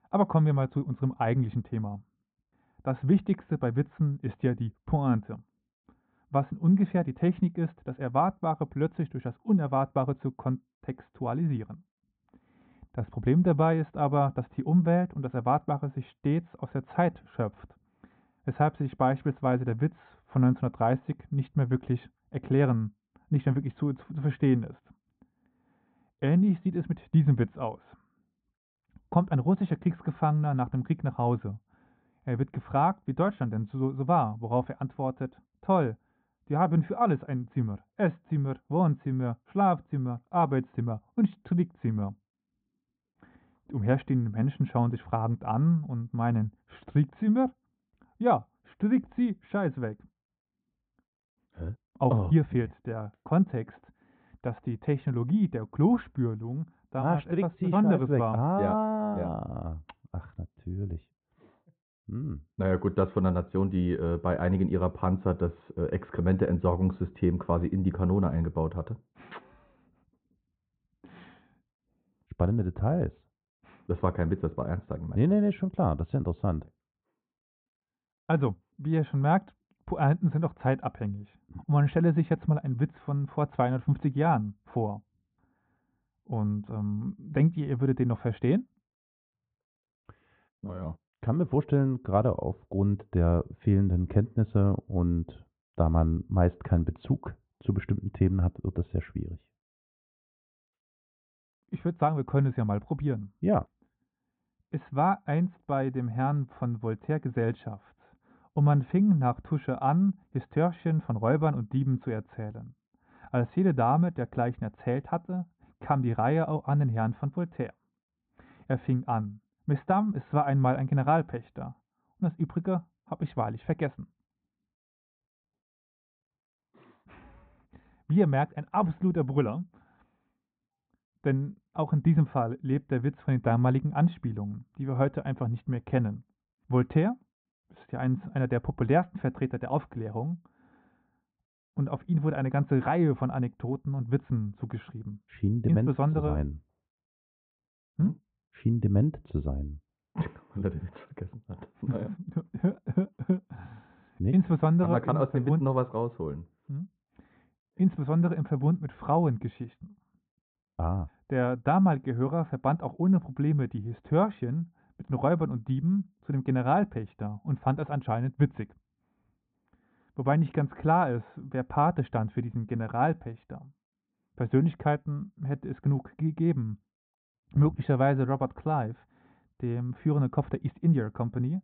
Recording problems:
muffled; very; fading above 3 kHz
high frequencies cut off; severe; nothing above 4 kHz

